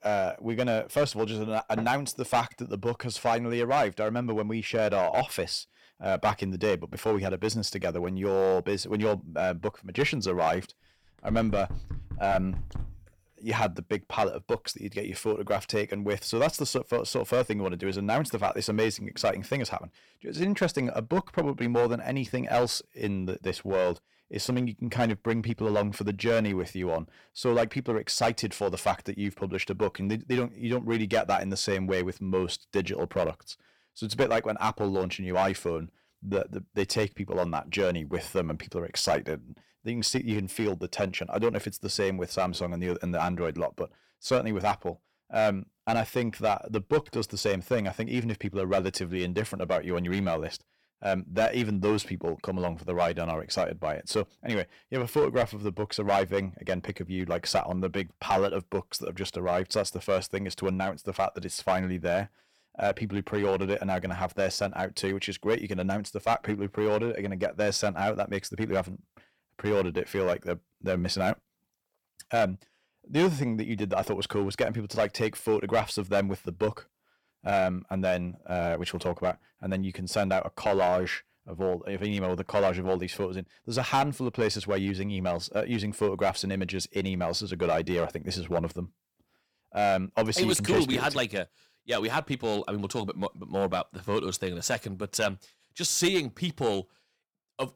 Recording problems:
distortion; slight; 3% of the sound clipped
door banging; noticeable; from 11 to 13 s; peak 9 dB below the speech

